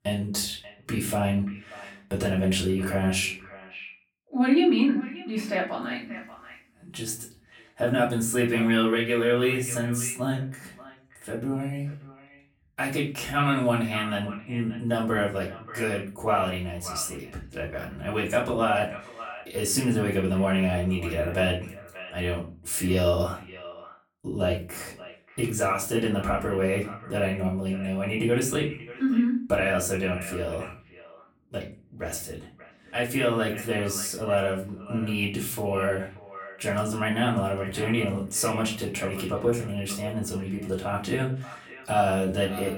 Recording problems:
off-mic speech; far
echo of what is said; noticeable; throughout; 580 ms later, 15 dB below the speech
room echo; slight; dies away in 0.3 s

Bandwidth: 18.5 kHz